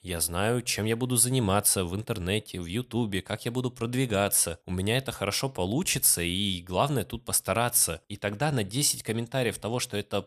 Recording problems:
none

